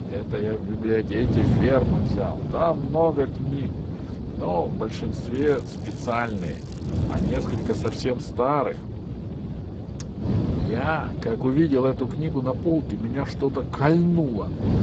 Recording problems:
garbled, watery; badly; nothing above 7.5 kHz
wind noise on the microphone; heavy; 10 dB below the speech
crackling; faint; from 5.5 to 8 s; 25 dB below the speech

